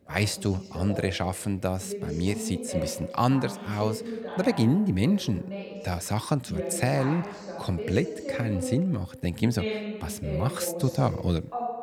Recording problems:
voice in the background; loud; throughout; 8 dB below the speech

